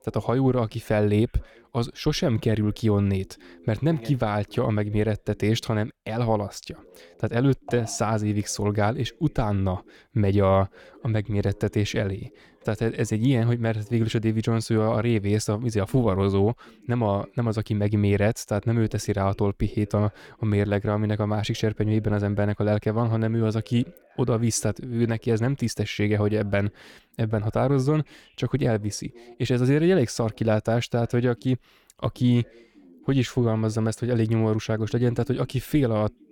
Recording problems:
voice in the background; faint; throughout; 30 dB below the speech

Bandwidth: 17.5 kHz